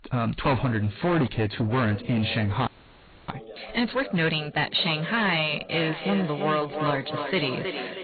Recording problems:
distortion; heavy; 13% of the sound clipped
echo of what is said; strong; from 5.5 s on; 320 ms later, 7 dB below the speech
garbled, watery; badly
high frequencies cut off; severe; nothing above 4 kHz
voice in the background; noticeable; throughout; 20 dB below the speech
audio freezing; at 2.5 s for 0.5 s

